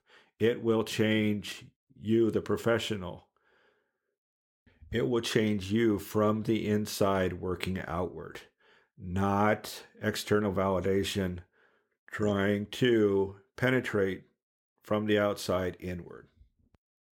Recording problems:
none

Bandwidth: 17 kHz